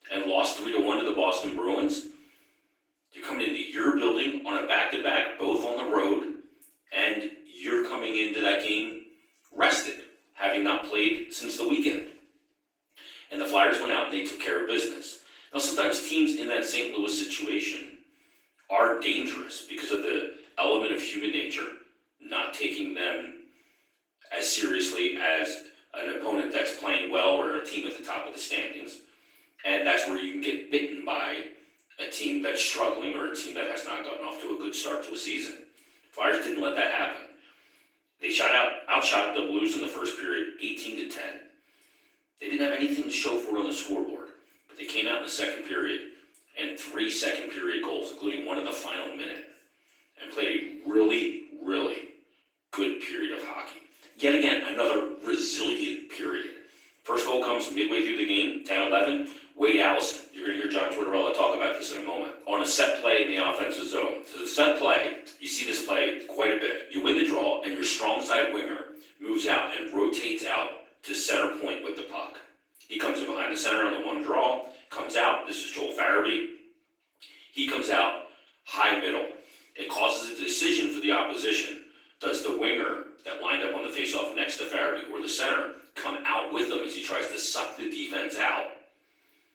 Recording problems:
off-mic speech; far
room echo; noticeable; dies away in 0.5 s
thin; somewhat; fading below 300 Hz
garbled, watery; slightly

